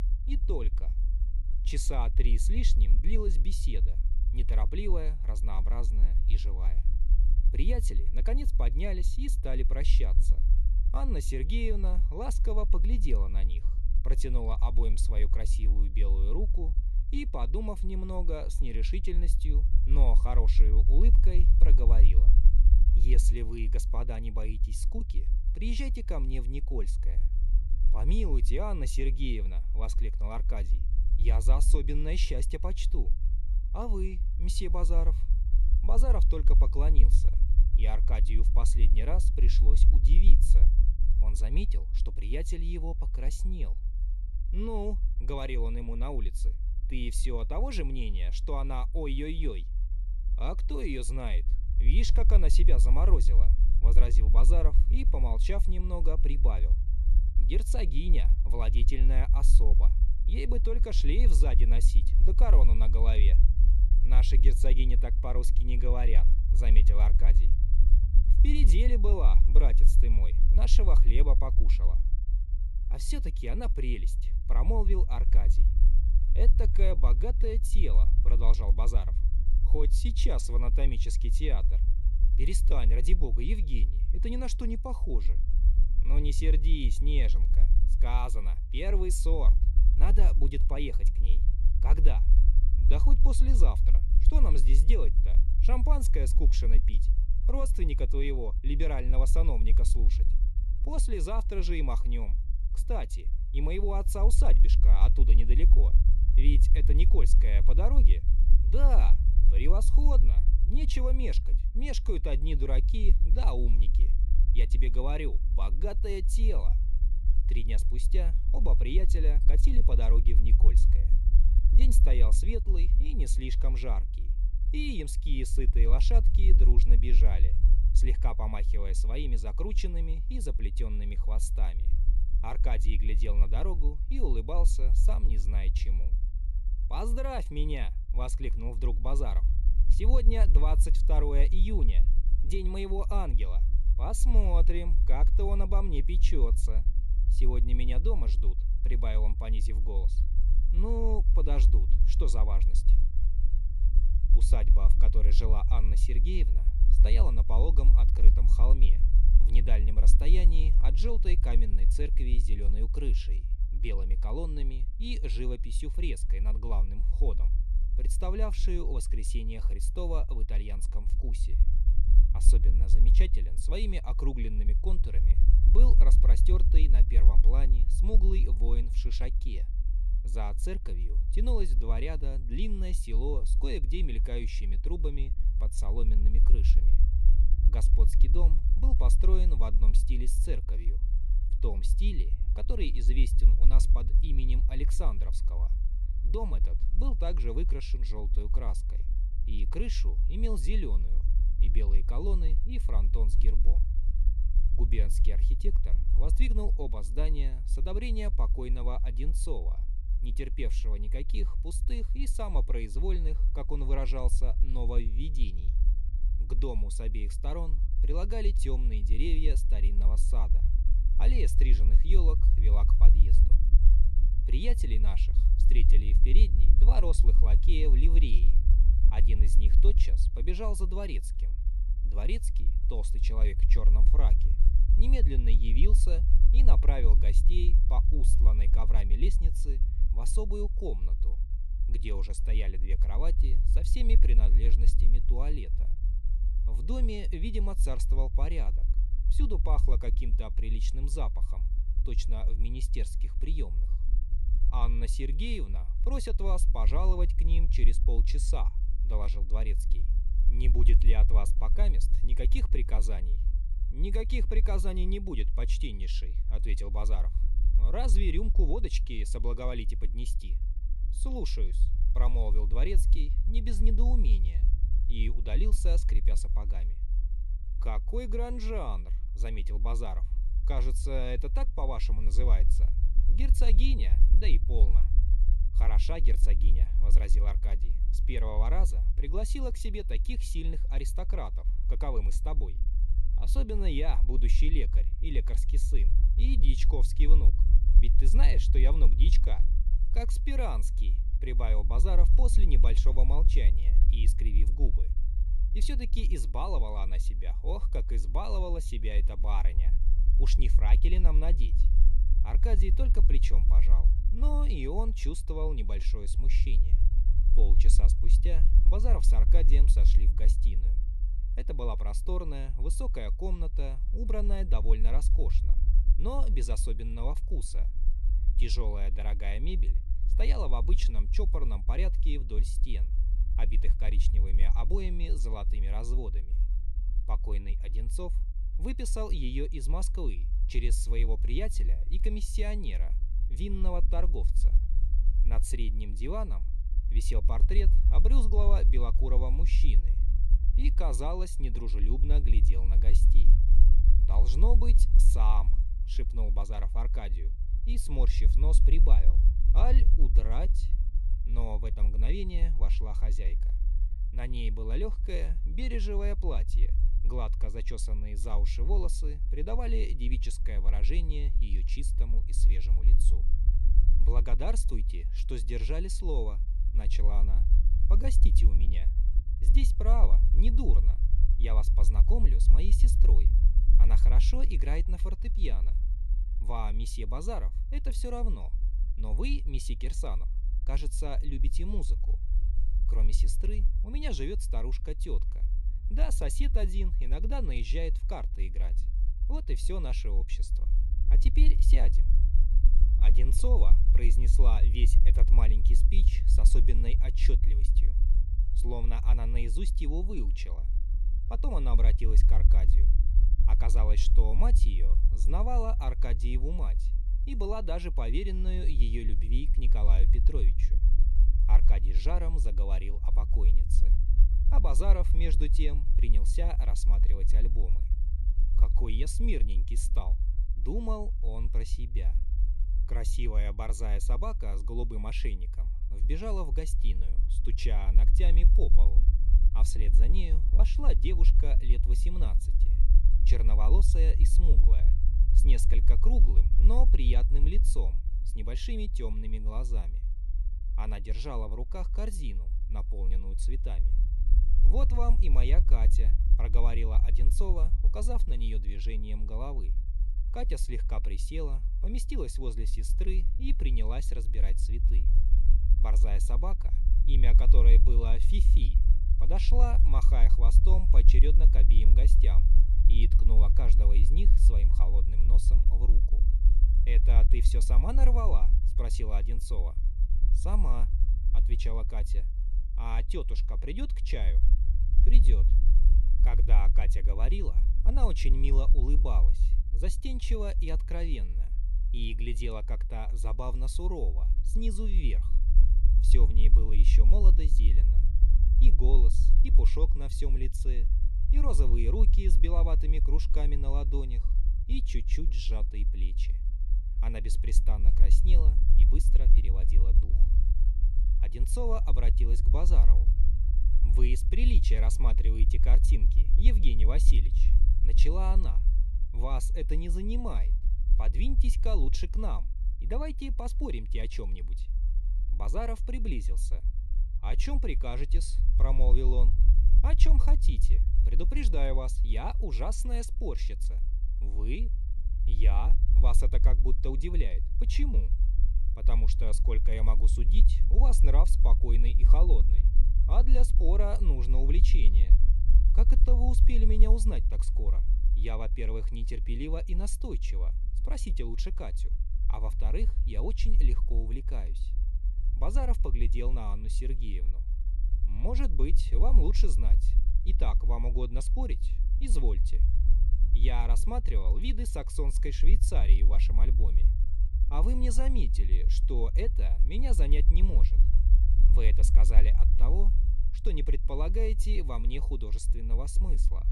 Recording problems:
low rumble; loud; throughout; 10 dB below the speech

